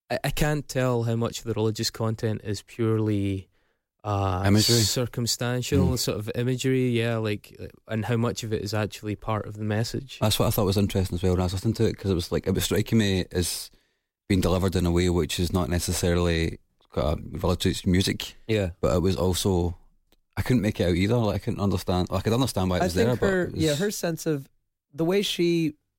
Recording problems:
none

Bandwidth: 16 kHz